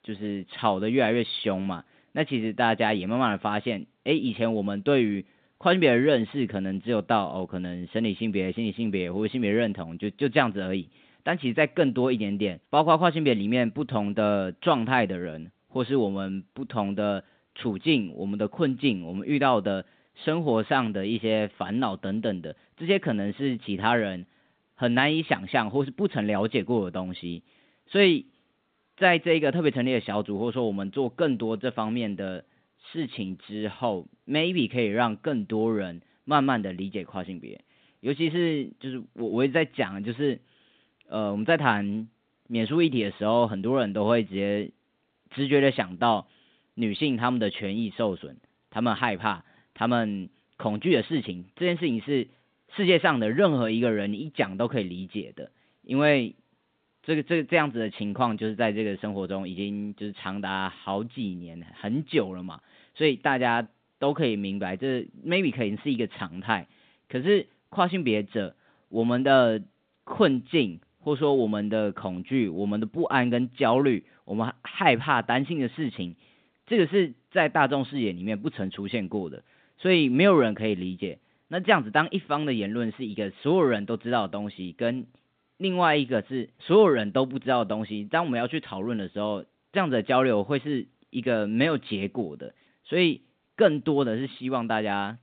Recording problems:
phone-call audio; nothing above 4 kHz

